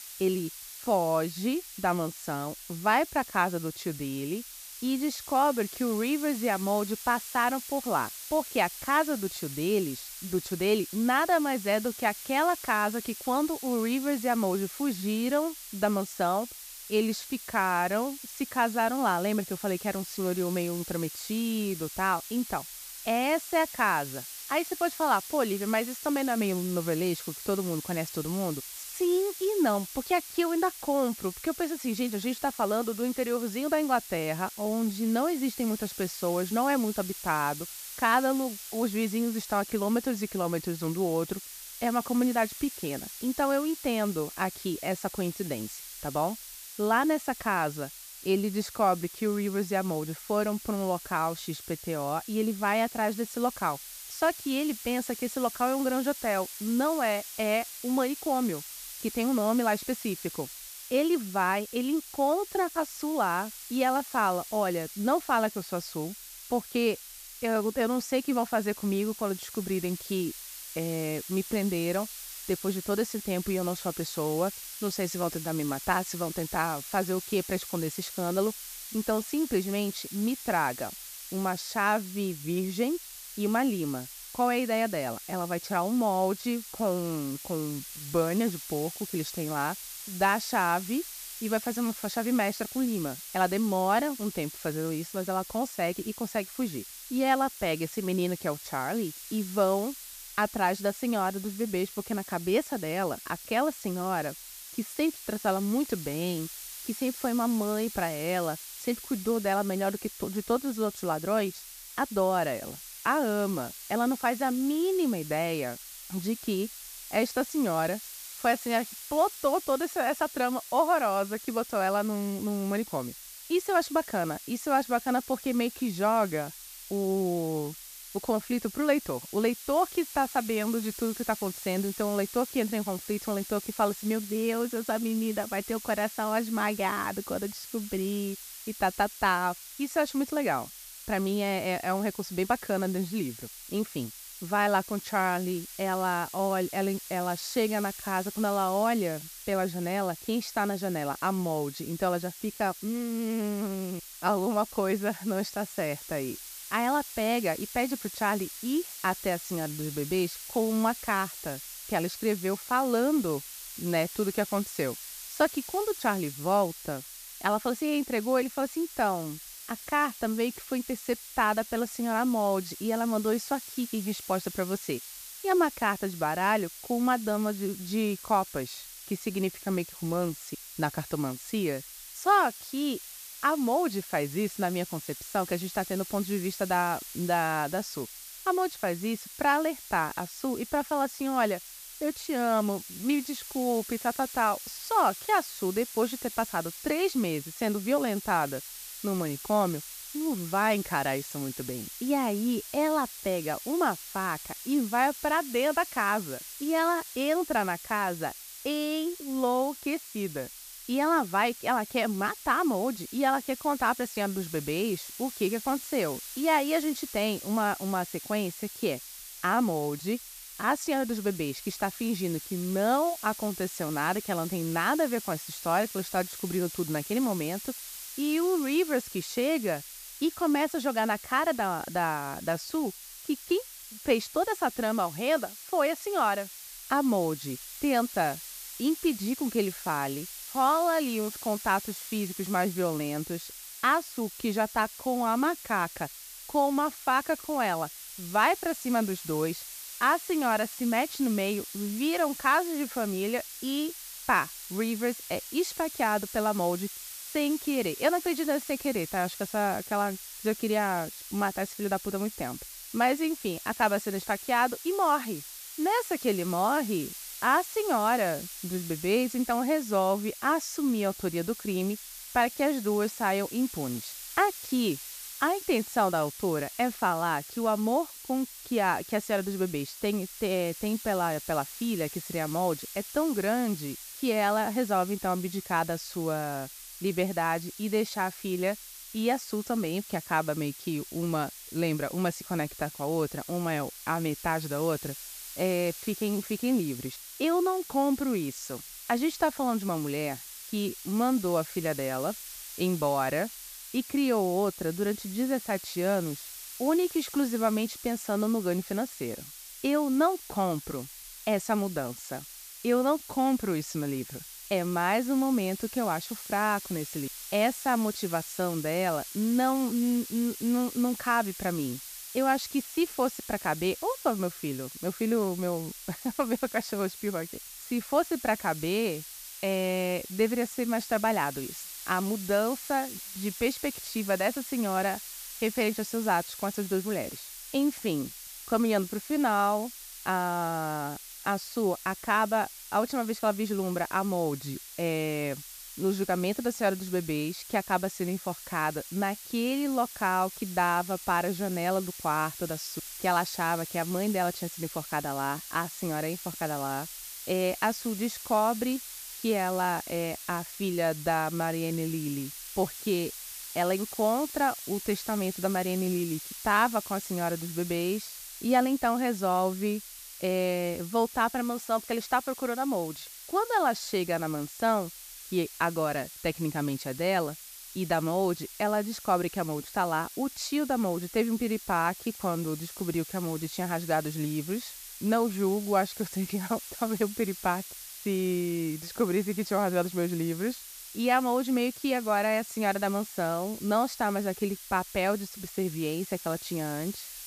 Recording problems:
hiss; noticeable; throughout; 10 dB below the speech

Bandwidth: 14.5 kHz